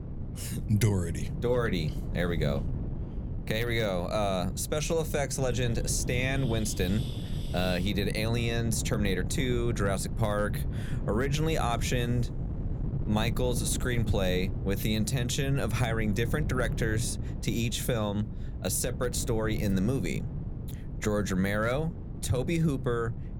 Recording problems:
wind noise on the microphone; occasional gusts; 15 dB below the speech

